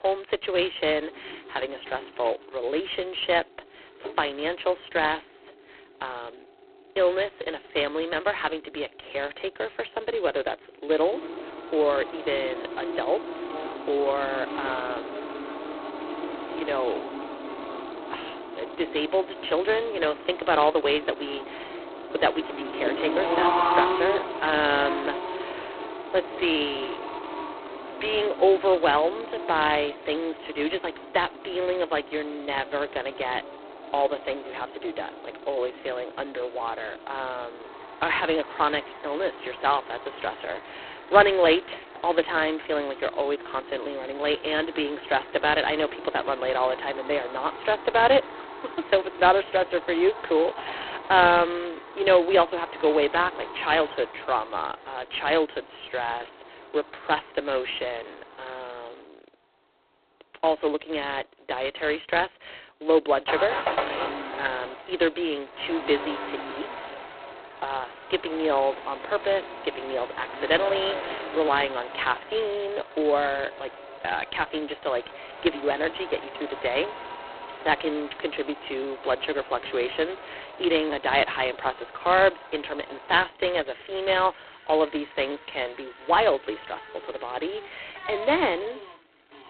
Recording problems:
phone-call audio; poor line; nothing above 4 kHz
traffic noise; loud; throughout; 10 dB below the speech

